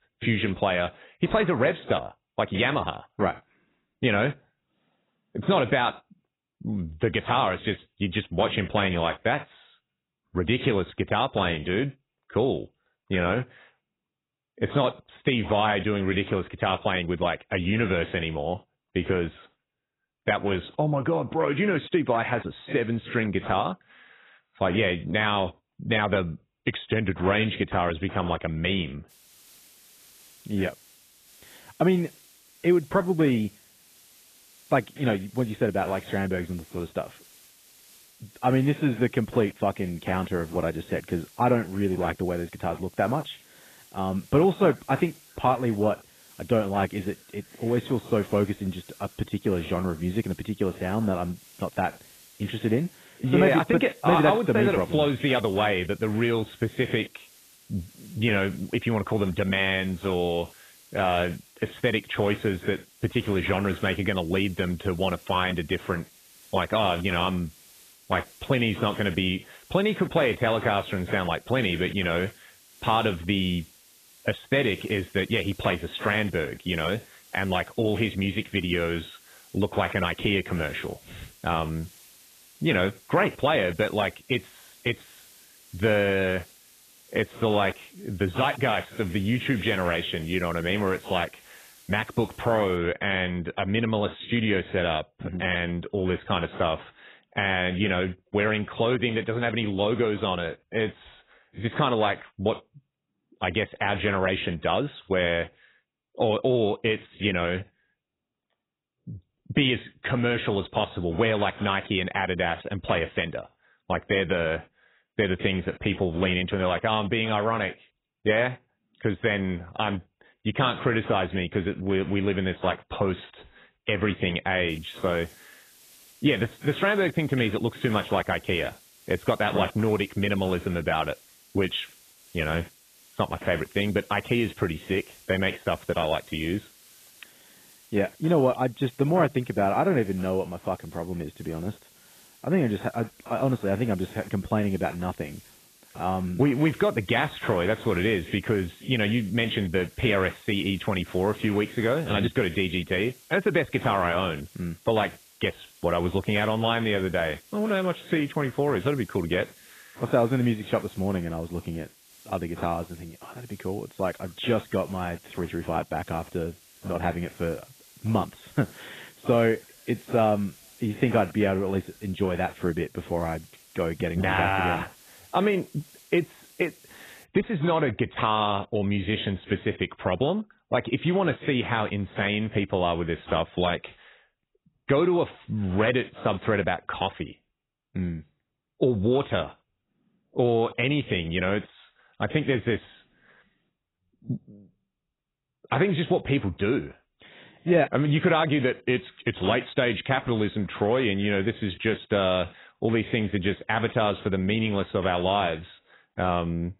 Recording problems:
garbled, watery; badly; nothing above 3.5 kHz
hiss; faint; from 29 s to 1:33 and from 2:05 to 2:57; 25 dB below the speech

